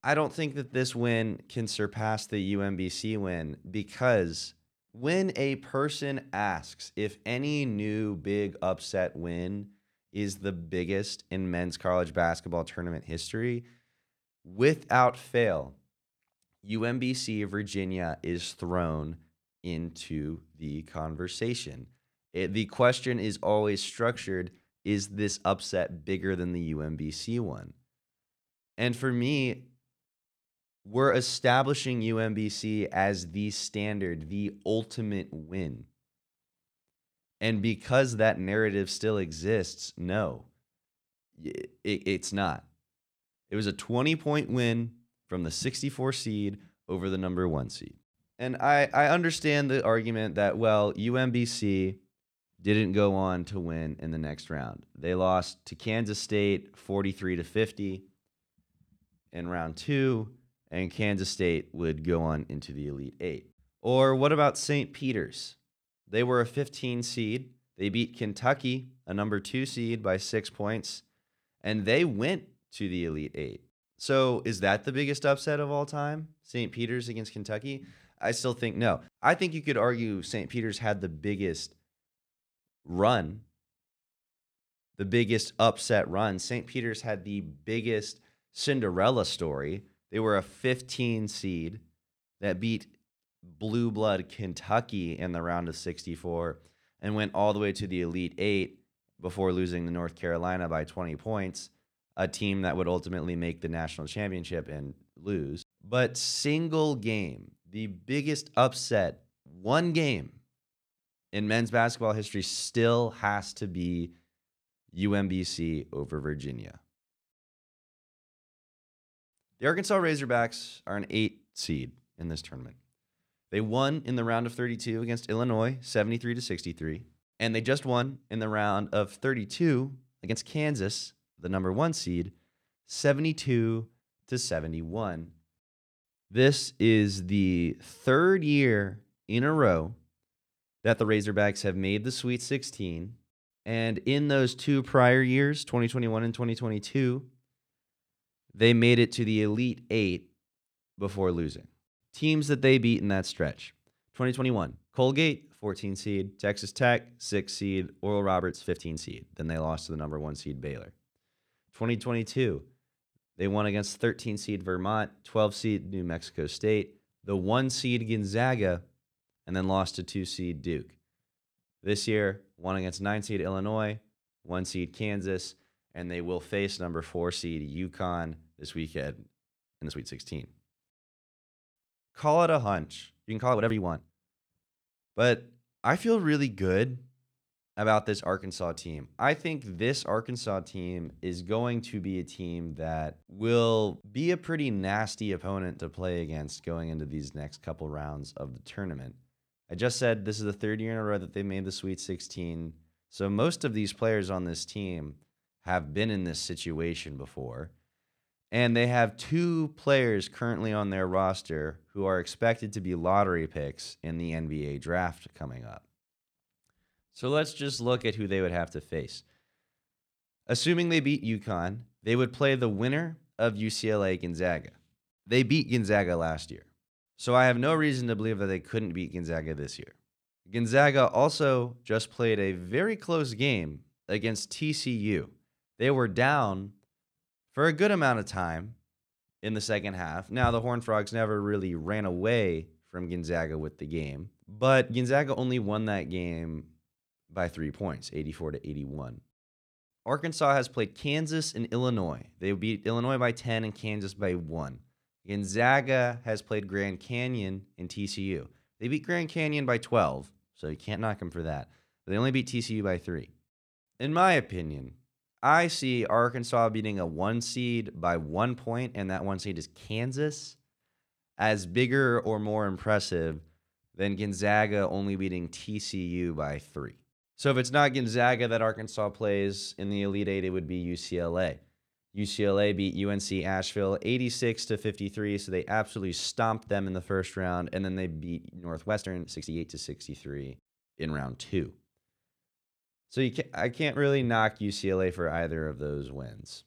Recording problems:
uneven, jittery; strongly; from 1:00 to 4:50

